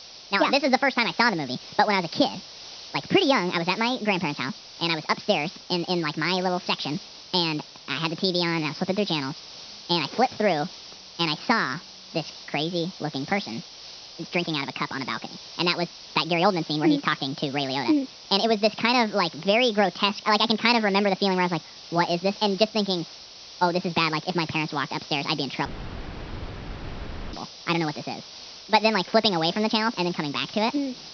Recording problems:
wrong speed and pitch; too fast and too high; 1.5 times normal speed
high frequencies cut off; noticeable; nothing above 6 kHz
hiss; noticeable; throughout; 15 dB below the speech
audio cutting out; at 26 s for 1.5 s

